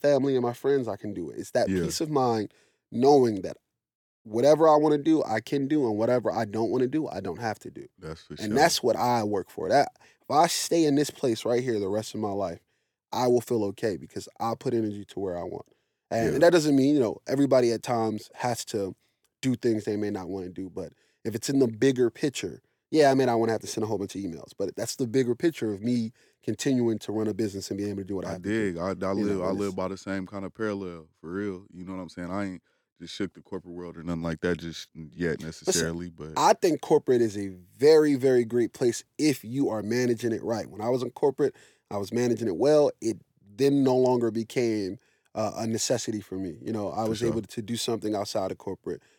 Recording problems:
none

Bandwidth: 18 kHz